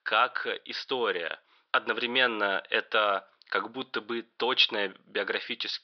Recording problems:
thin; very; fading below 650 Hz
high frequencies cut off; noticeable; nothing above 5.5 kHz

